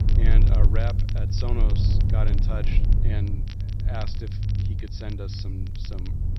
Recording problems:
high frequencies cut off; noticeable; nothing above 6 kHz
low rumble; loud; throughout; 3 dB below the speech
crackle, like an old record; noticeable; 10 dB below the speech
hiss; faint; throughout; 30 dB below the speech

